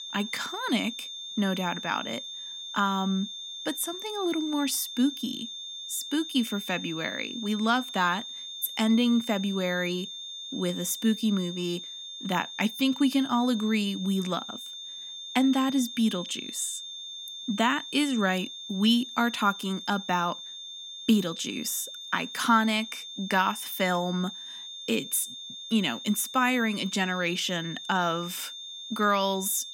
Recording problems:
high-pitched whine; loud; throughout; 3.5 kHz, 9 dB below the speech

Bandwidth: 16.5 kHz